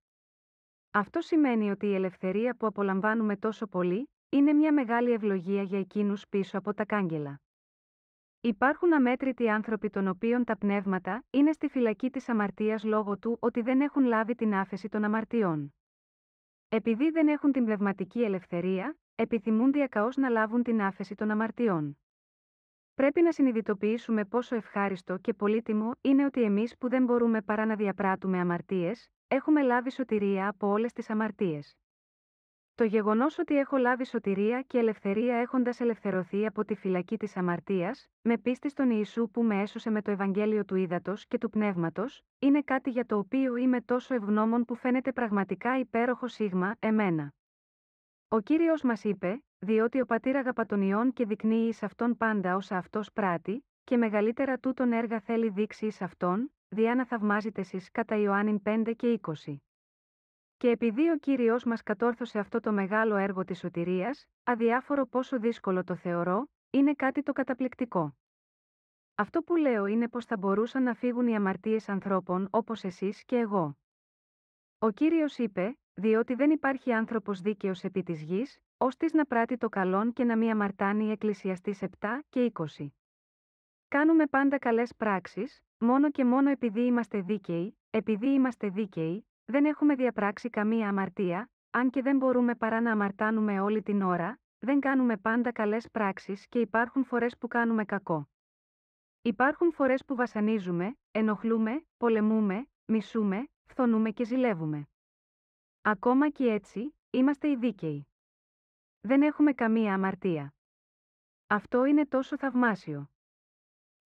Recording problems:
muffled; very; fading above 1.5 kHz

